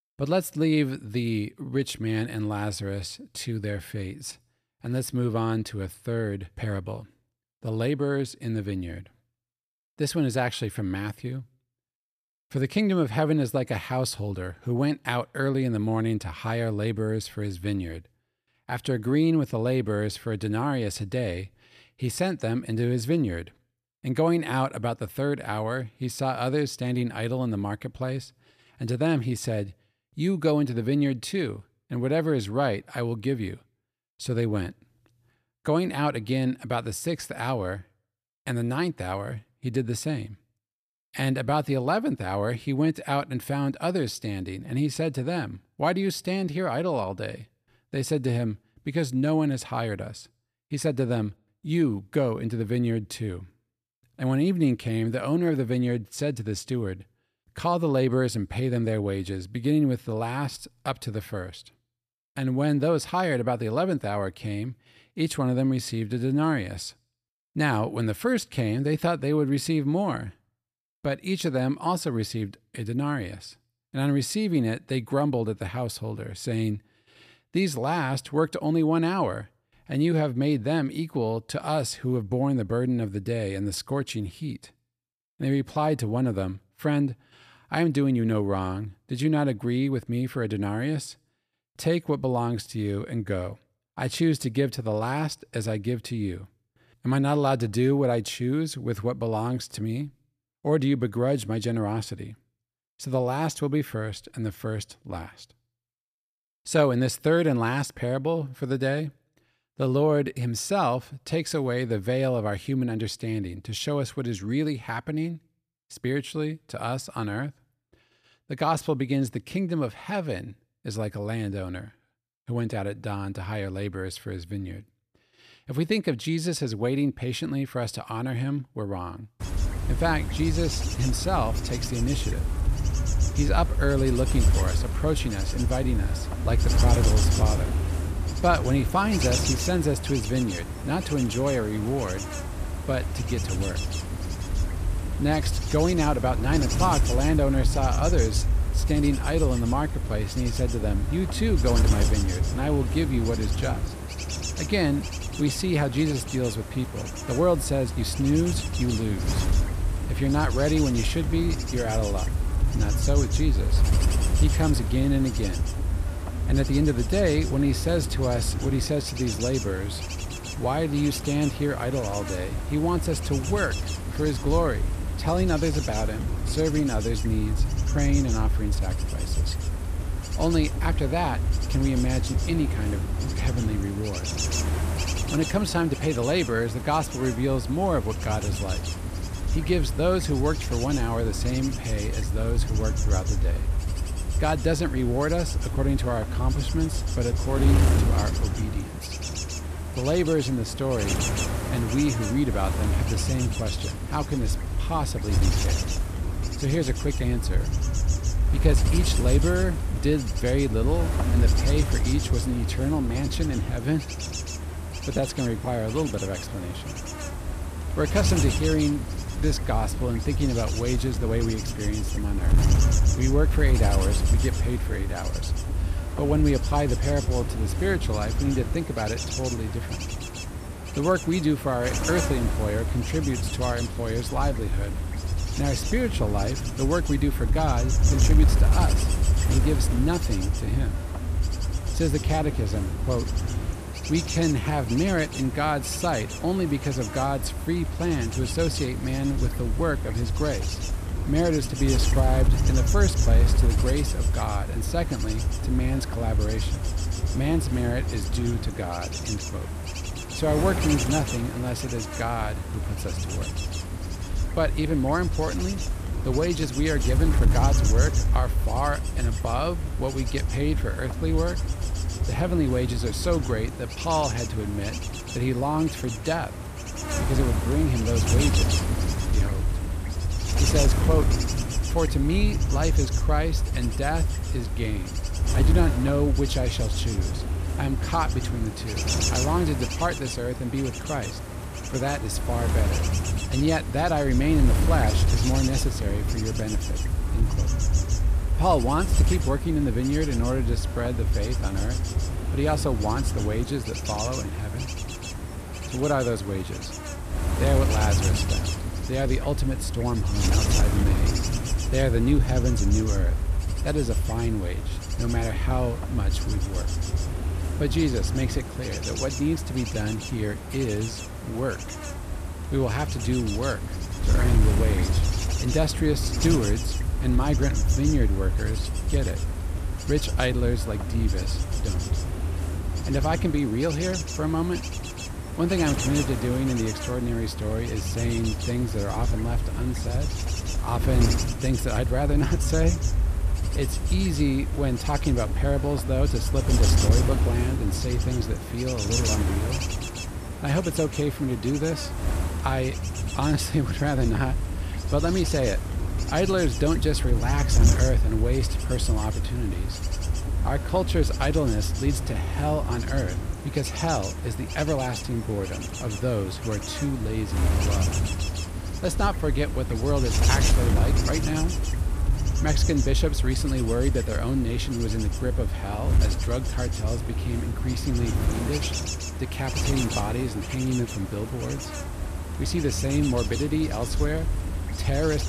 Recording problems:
wind noise on the microphone; heavy; from 2:09 on; 6 dB below the speech

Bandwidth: 14.5 kHz